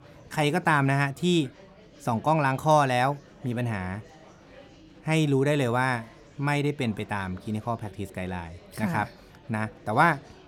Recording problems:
murmuring crowd; faint; throughout; 25 dB below the speech

